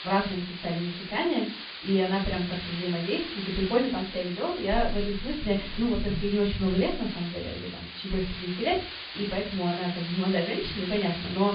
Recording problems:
off-mic speech; far
high frequencies cut off; severe; nothing above 5 kHz
room echo; slight; dies away in 0.3 s
hiss; loud; throughout; 8 dB below the speech

